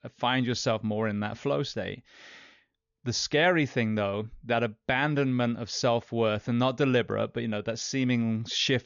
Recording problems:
high frequencies cut off; noticeable; nothing above 7 kHz

